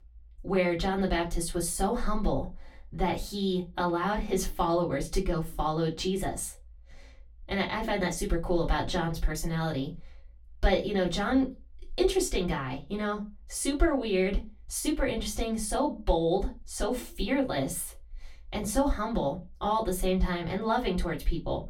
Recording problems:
off-mic speech; far
room echo; very slight; dies away in 0.2 s

